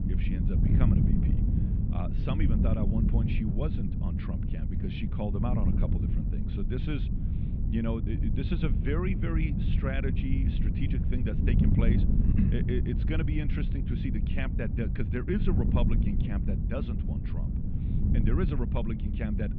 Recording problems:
muffled; very; fading above 3.5 kHz
high frequencies cut off; slight; nothing above 8 kHz
wind noise on the microphone; heavy; 2 dB below the speech

